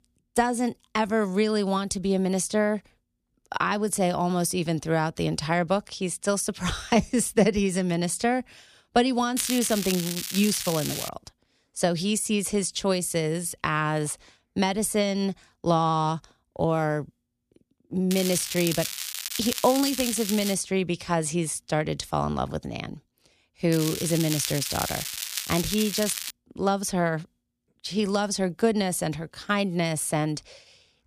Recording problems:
crackling; loud; from 9.5 to 11 s, from 18 to 21 s and from 24 to 26 s; 5 dB below the speech

